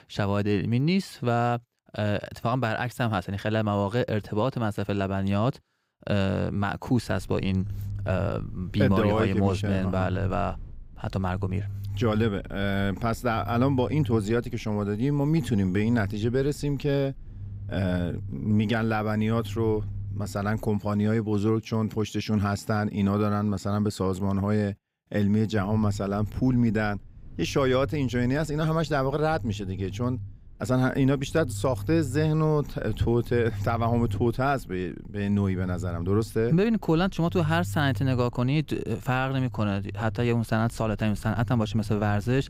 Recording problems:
low rumble; faint; from 7 to 21 s and from 26 s on; 25 dB below the speech

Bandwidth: 15.5 kHz